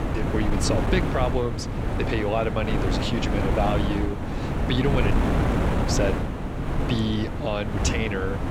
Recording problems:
wind noise on the microphone; heavy; 2 dB below the speech

